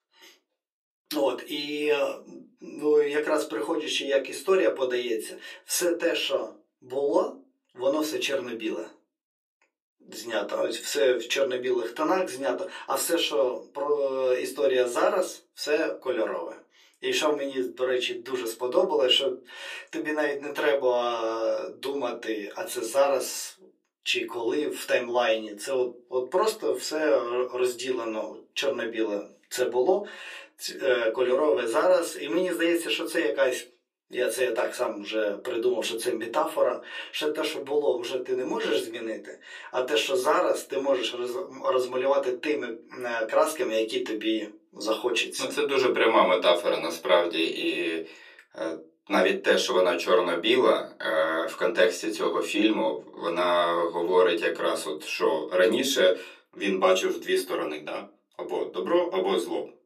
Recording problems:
off-mic speech; far
thin; very; fading below 350 Hz
room echo; very slight; dies away in 0.2 s

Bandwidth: 14.5 kHz